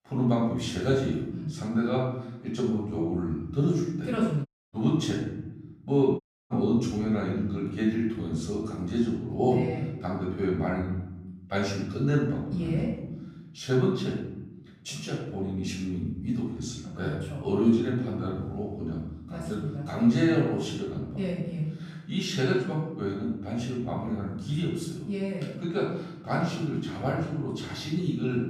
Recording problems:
off-mic speech; far
room echo; noticeable; dies away in 0.9 s
audio cutting out; at 4.5 s and at 6 s

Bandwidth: 14.5 kHz